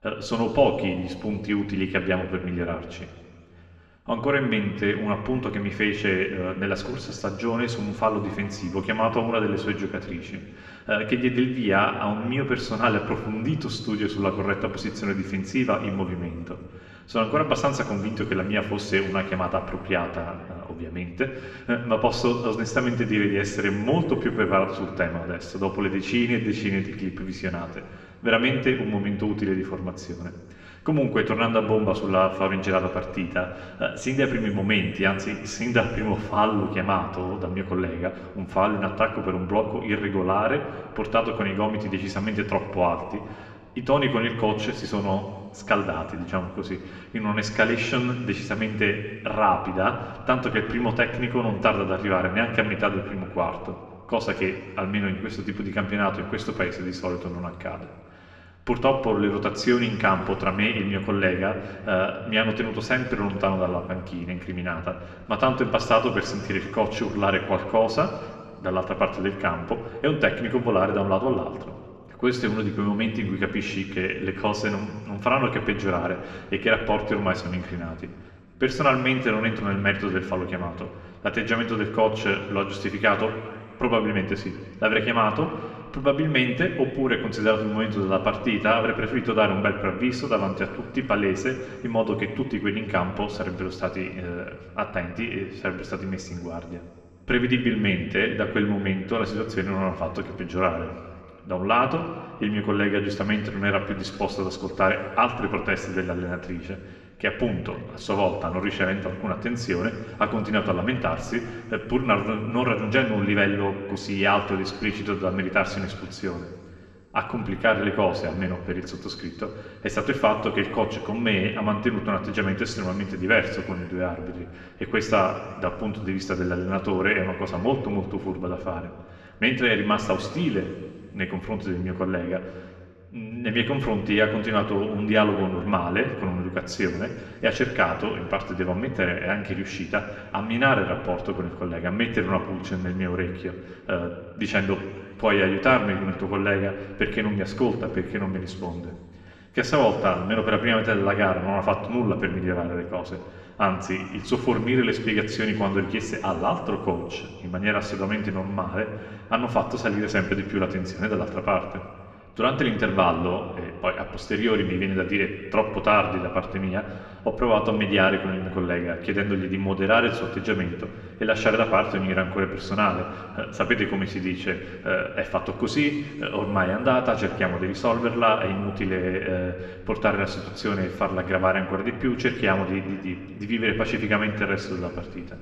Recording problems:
muffled; slightly; fading above 3 kHz
room echo; slight; dies away in 2.1 s
off-mic speech; somewhat distant

